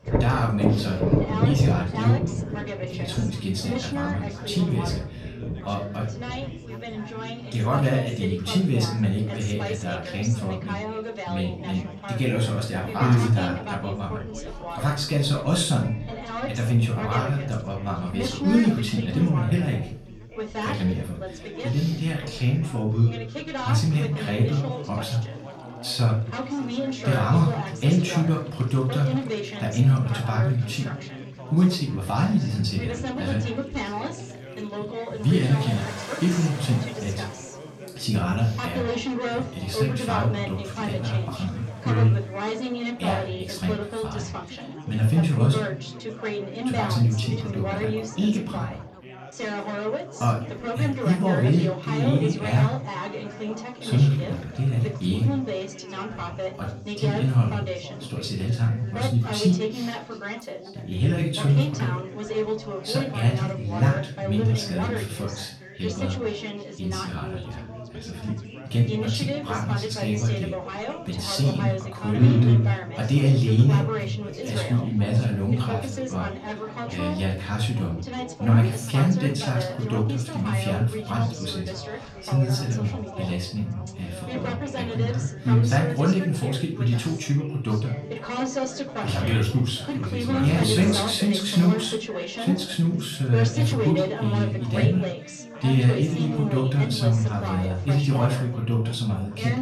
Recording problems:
off-mic speech; far
room echo; slight; dies away in 0.4 s
rain or running water; loud; throughout; 8 dB below the speech
background chatter; loud; throughout; 4 voices, 8 dB below the speech

